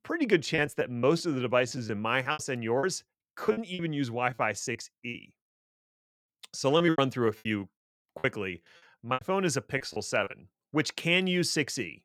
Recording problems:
choppy; very; from 0.5 to 5 s and from 7 to 10 s; 13% of the speech affected

